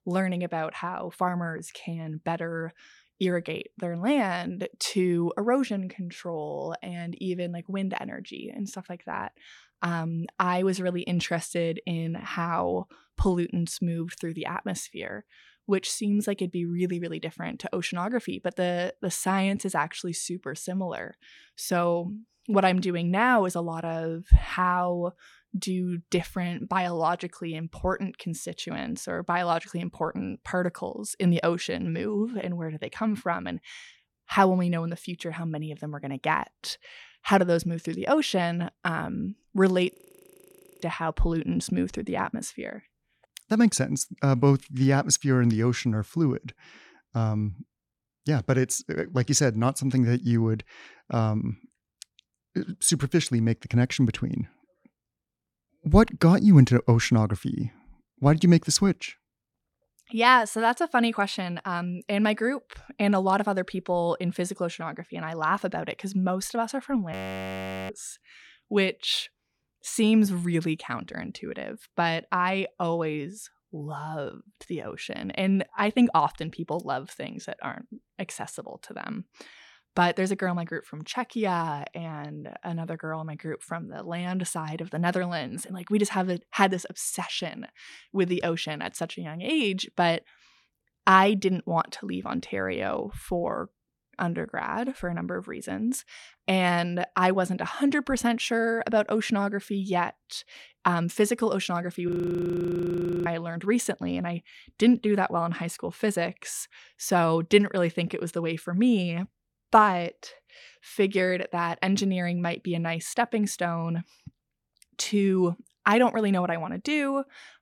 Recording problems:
audio freezing; at 40 s for 1 s, at 1:07 for 1 s and at 1:42 for 1 s

